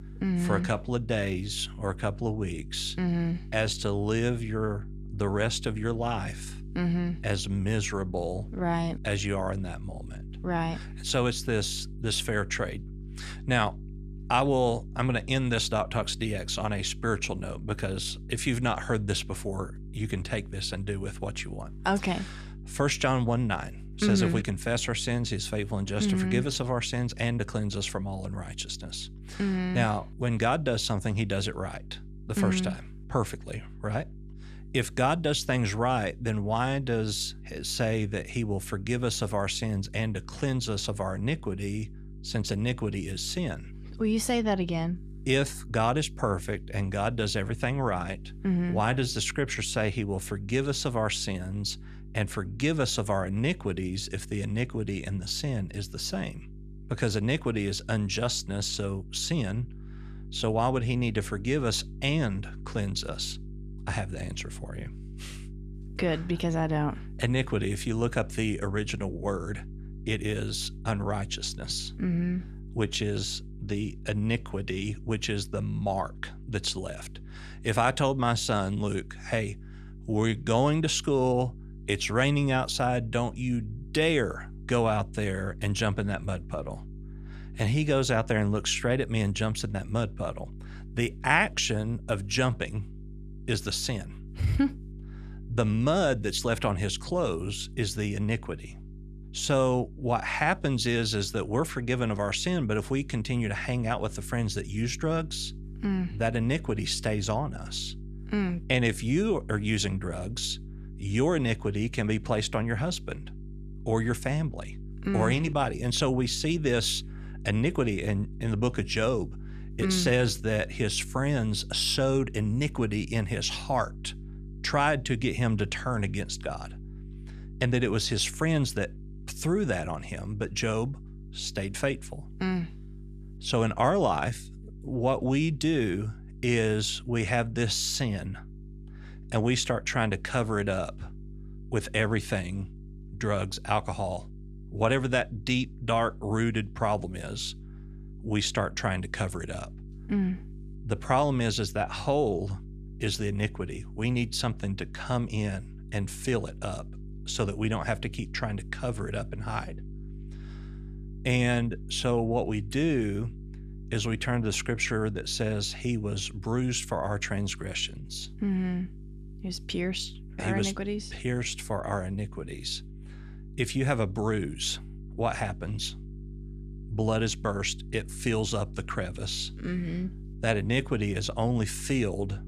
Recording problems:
electrical hum; faint; throughout; 50 Hz, 25 dB below the speech

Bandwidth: 13.5 kHz